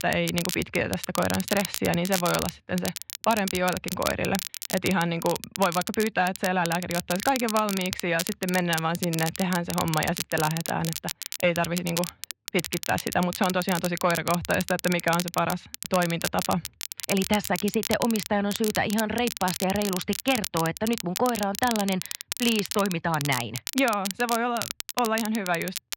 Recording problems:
muffled; slightly; fading above 3.5 kHz
crackle, like an old record; loud; 7 dB below the speech

